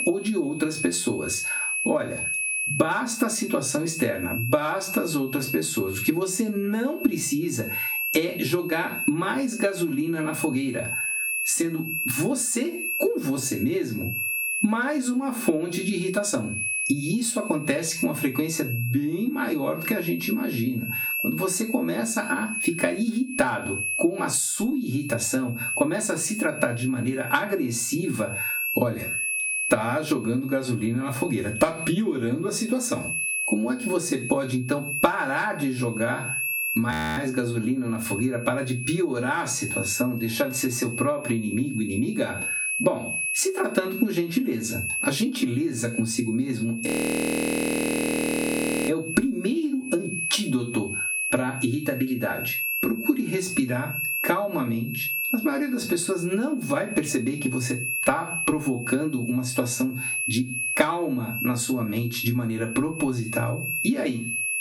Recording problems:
off-mic speech; far
room echo; very slight; dies away in 0.2 s
squashed, flat; somewhat
high-pitched whine; loud; throughout; 2.5 kHz, 4 dB below the speech
audio freezing; at 37 s and at 47 s for 2 s

